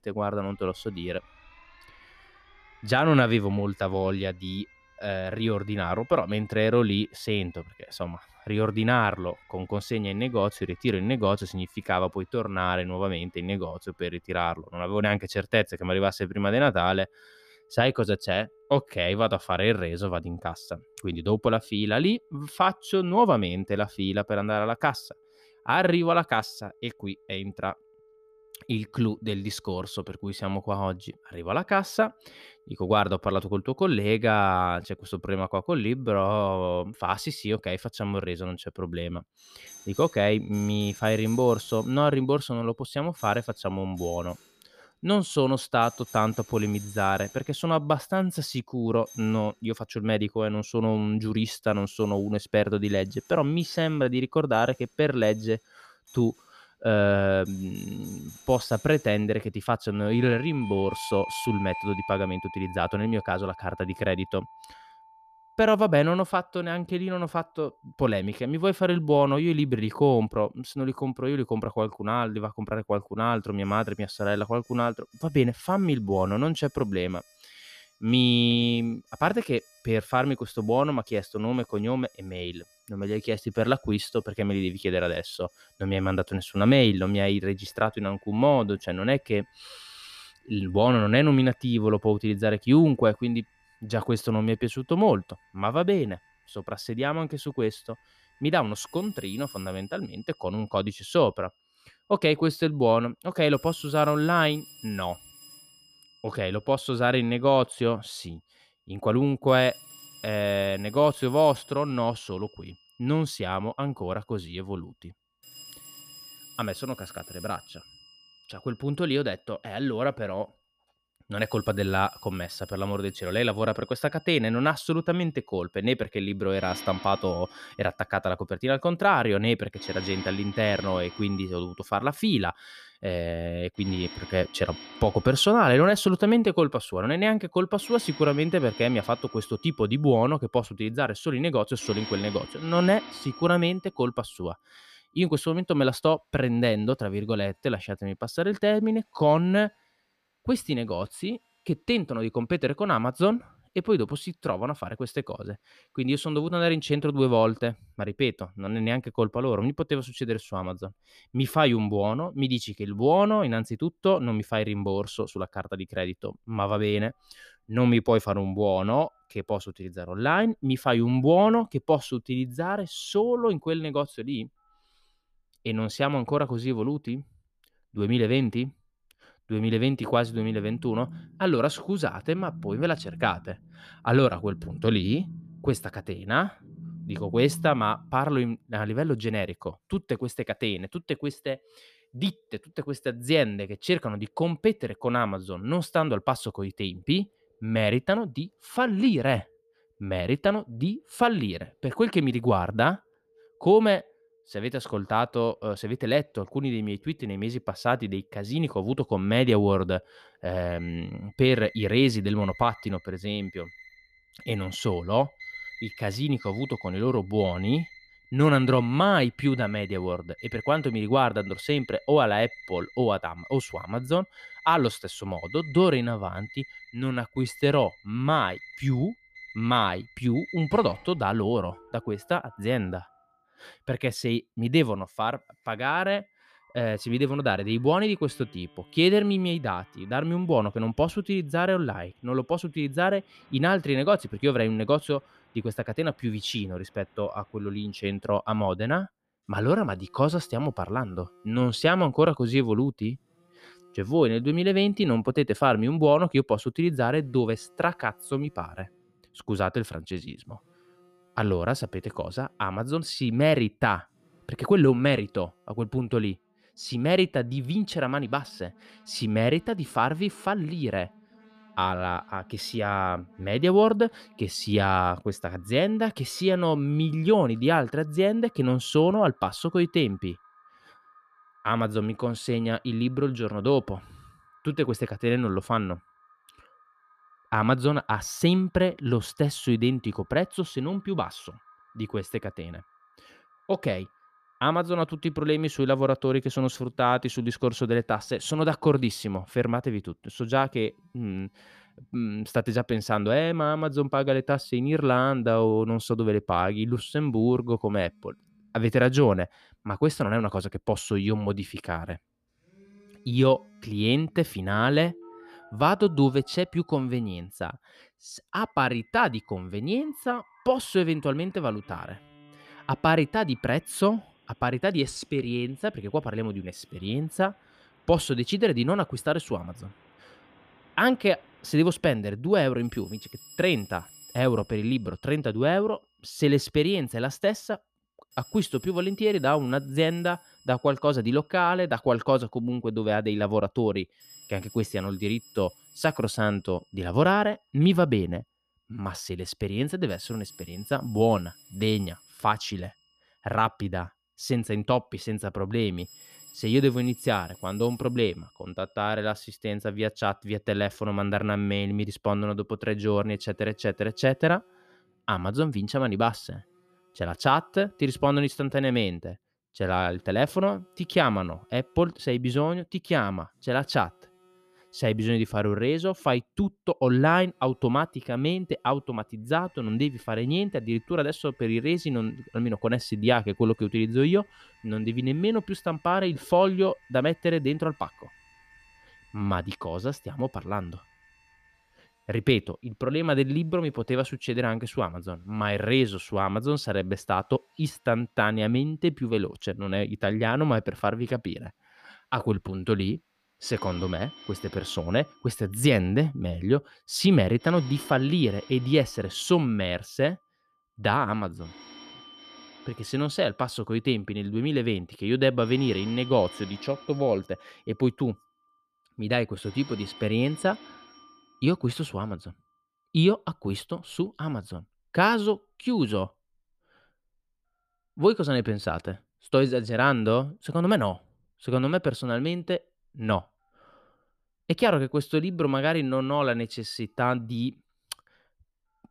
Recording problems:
alarms or sirens; faint; throughout; 20 dB below the speech

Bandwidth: 14.5 kHz